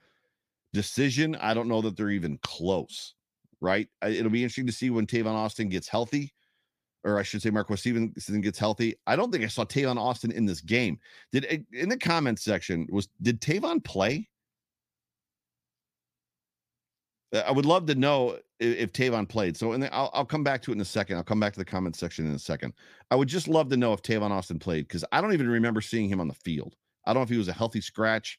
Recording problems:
none

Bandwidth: 15 kHz